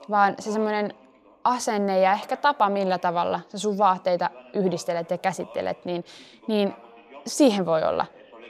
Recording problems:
voice in the background; faint; throughout; 25 dB below the speech

